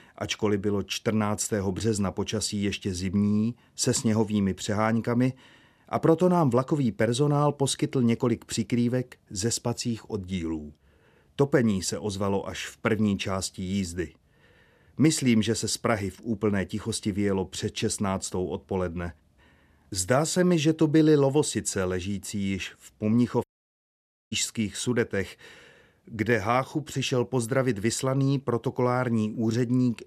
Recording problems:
audio cutting out; at 23 s for 1 s

